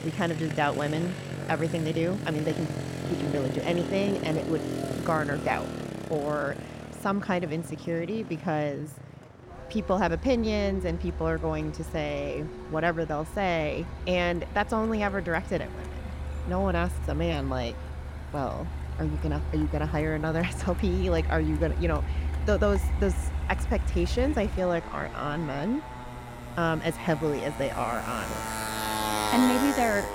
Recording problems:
traffic noise; loud; throughout; 5 dB below the speech

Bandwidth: 16 kHz